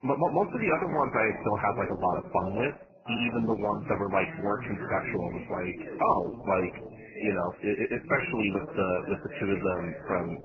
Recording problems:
garbled, watery; badly; nothing above 3 kHz
voice in the background; noticeable; throughout; 10 dB below the speech

